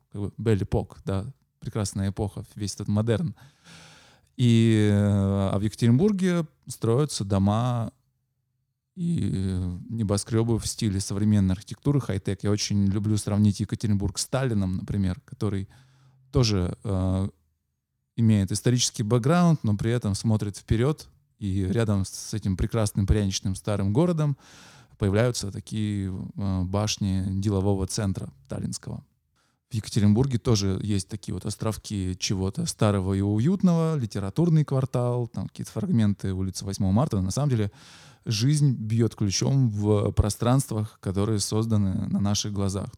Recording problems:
uneven, jittery; strongly; from 2.5 to 38 s

